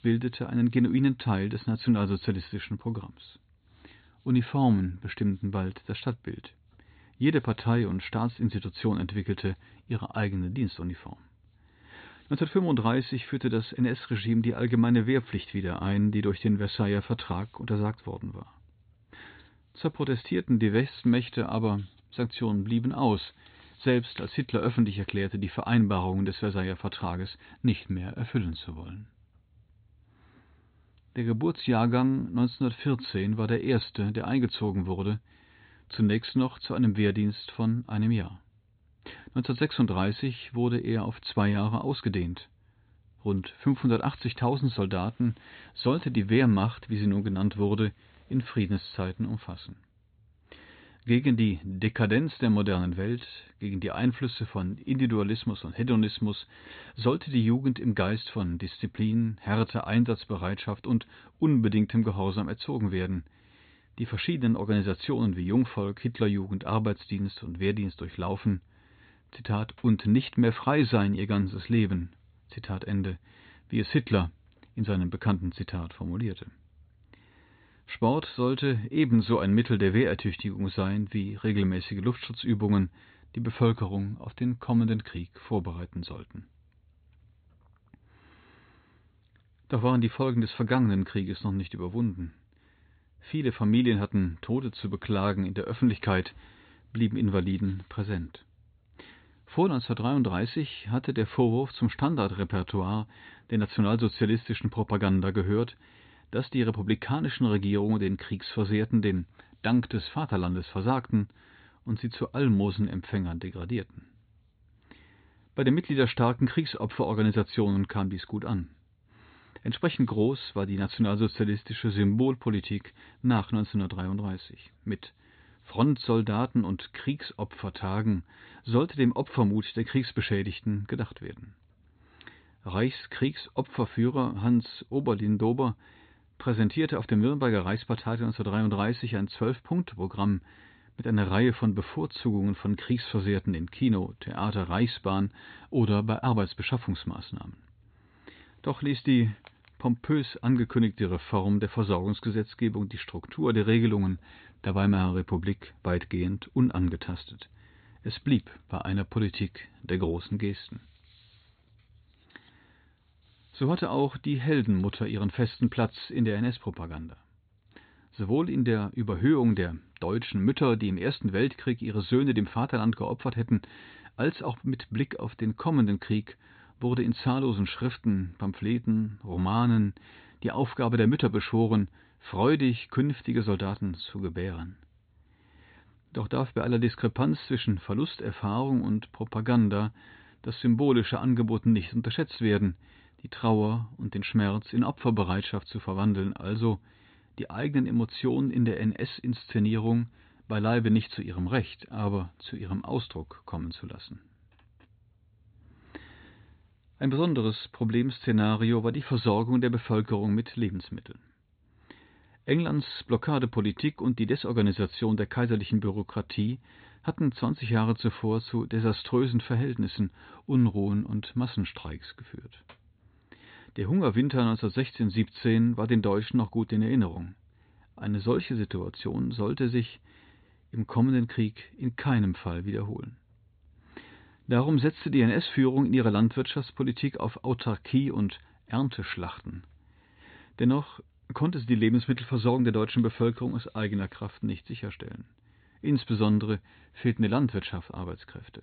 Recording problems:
high frequencies cut off; severe; nothing above 4 kHz

